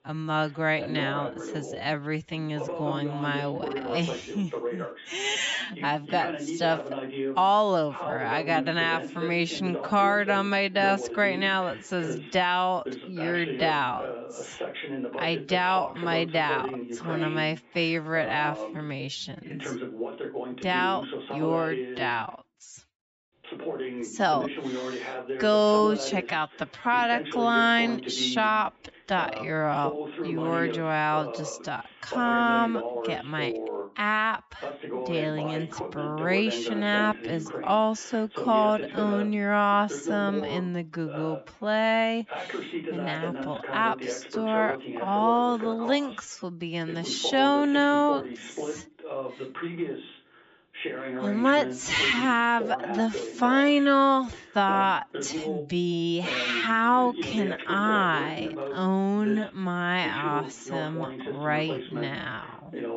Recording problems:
wrong speed, natural pitch; too slow; 0.5 times normal speed
high frequencies cut off; noticeable; nothing above 8 kHz
voice in the background; loud; throughout; 9 dB below the speech

